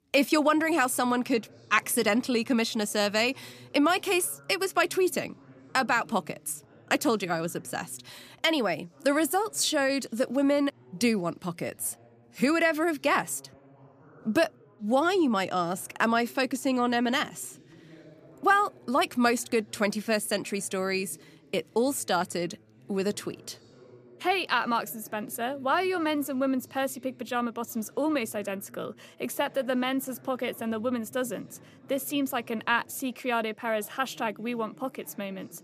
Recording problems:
background chatter; faint; throughout; 2 voices, 25 dB below the speech

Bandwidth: 14.5 kHz